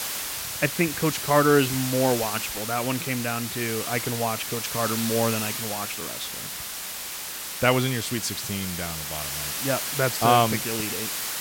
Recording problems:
hiss; loud; throughout; 3 dB below the speech

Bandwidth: 16.5 kHz